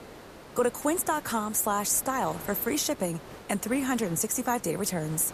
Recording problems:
hiss; noticeable; throughout; 15 dB below the speech

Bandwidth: 14.5 kHz